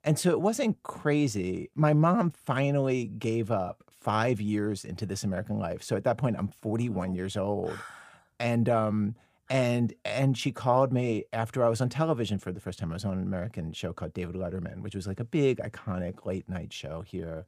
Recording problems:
none

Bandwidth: 15 kHz